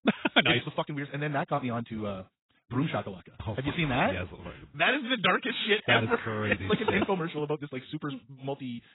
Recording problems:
garbled, watery; badly; nothing above 3.5 kHz
wrong speed, natural pitch; too fast; 1.7 times normal speed

